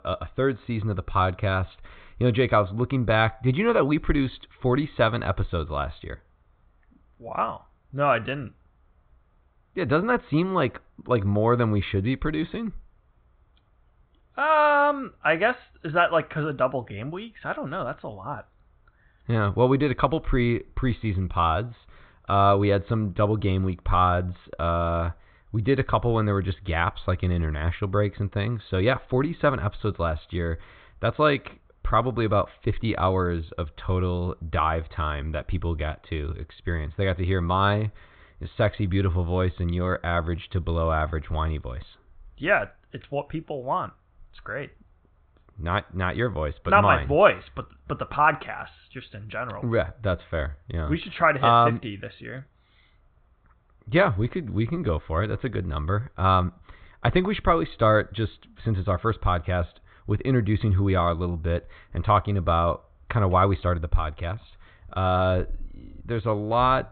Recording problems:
high frequencies cut off; severe; nothing above 4 kHz

